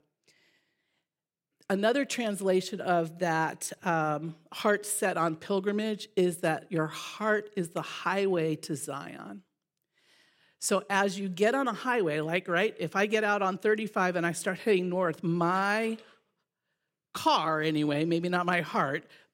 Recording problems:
none

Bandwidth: 16 kHz